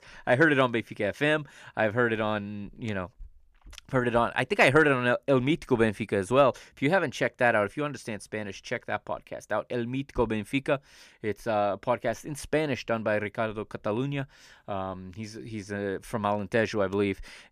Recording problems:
none

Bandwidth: 14.5 kHz